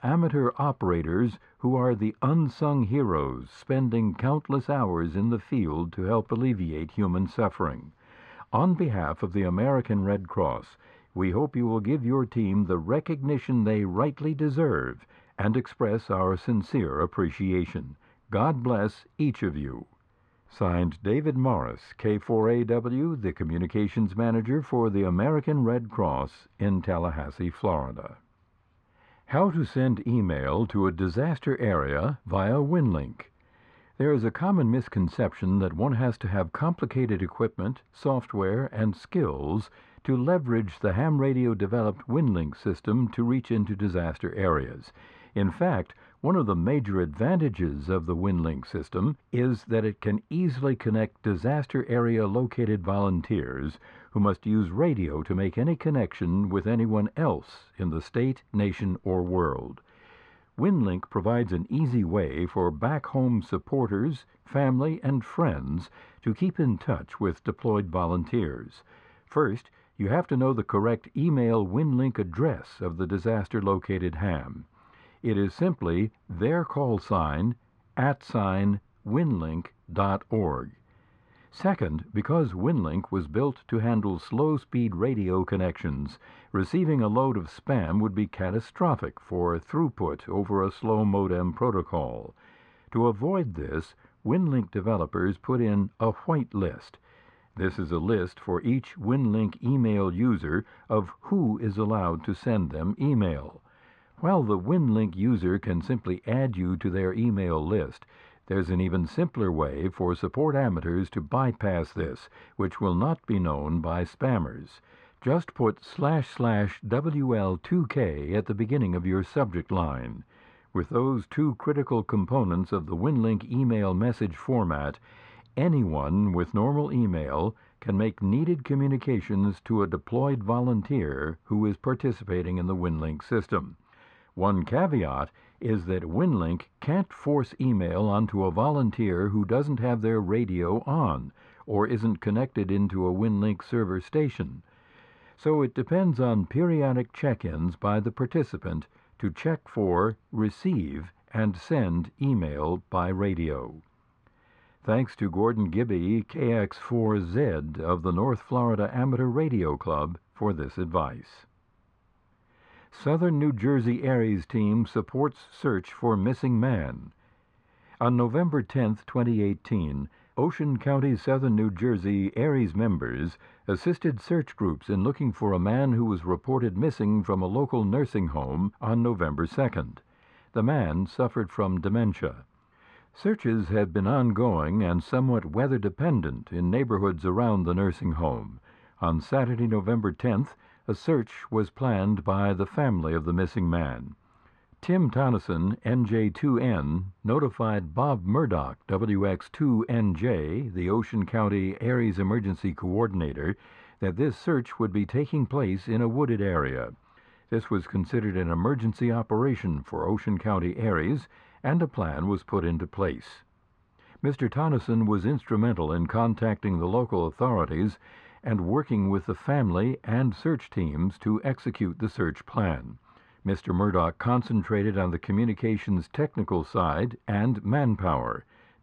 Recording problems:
muffled; very; fading above 1.5 kHz

